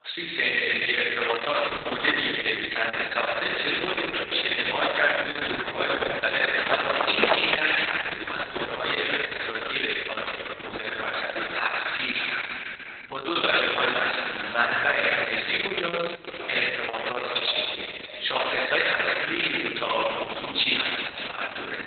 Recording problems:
garbled, watery; badly; nothing above 4 kHz
thin; very; fading below 700 Hz
echo of what is said; noticeable; throughout; 570 ms later, 15 dB below the speech
room echo; noticeable; dies away in 2.7 s
off-mic speech; somewhat distant
footsteps; loud; at 6.5 s; peak 5 dB above the speech

